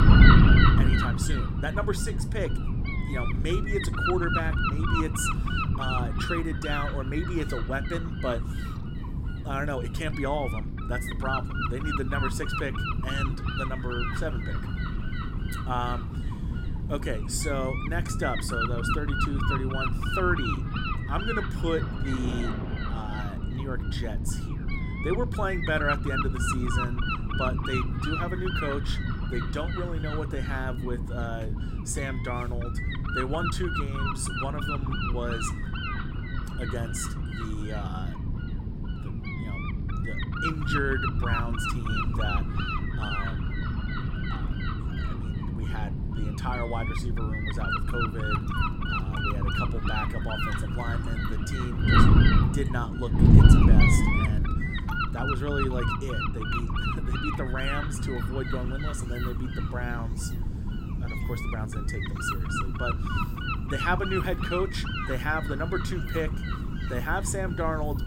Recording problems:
wind noise on the microphone; heavy; 2 dB above the speech
rain or running water; noticeable; throughout; 15 dB below the speech

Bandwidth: 16 kHz